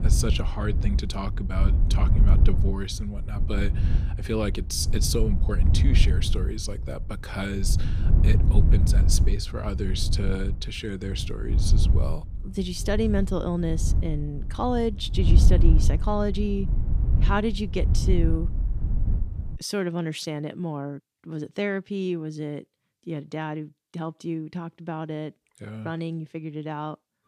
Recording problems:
wind noise on the microphone; heavy; until 20 s; 9 dB below the speech

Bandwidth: 14.5 kHz